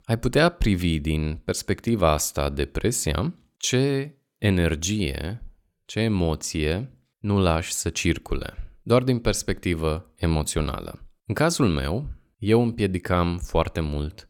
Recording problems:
none

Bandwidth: 17.5 kHz